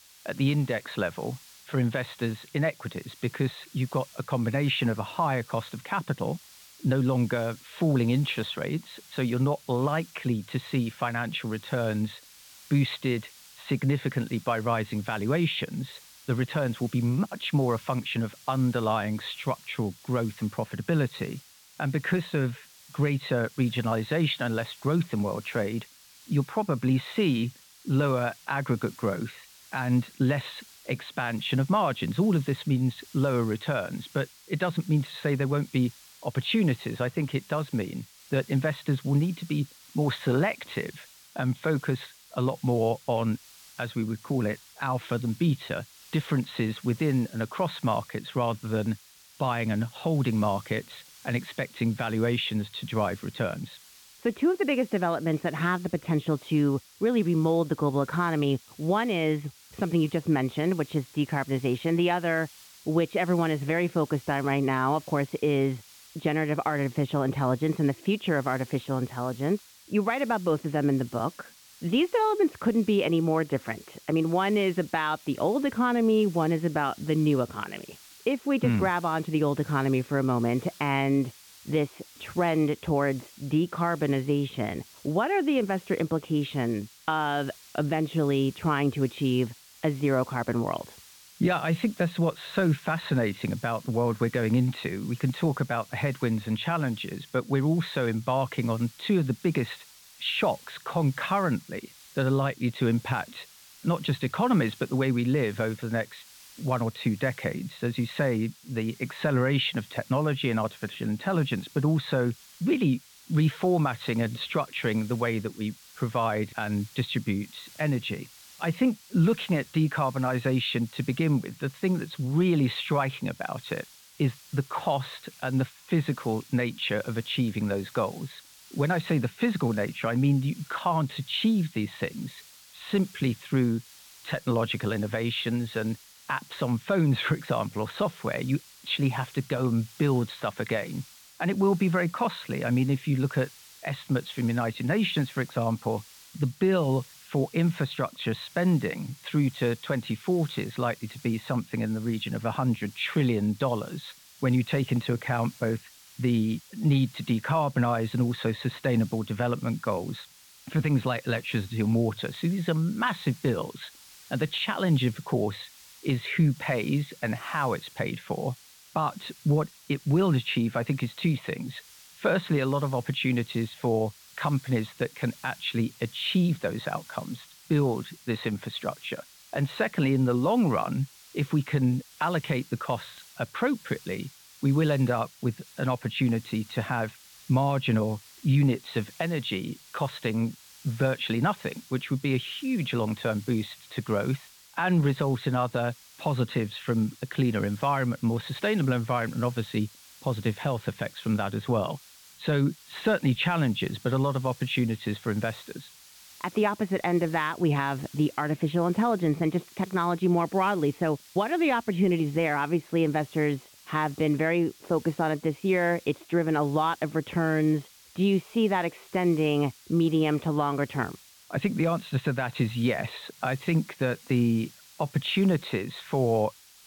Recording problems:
high frequencies cut off; severe; nothing above 4 kHz
hiss; faint; throughout; 20 dB below the speech

